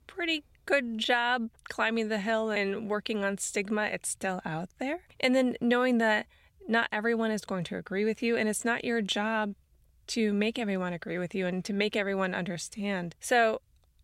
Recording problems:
none

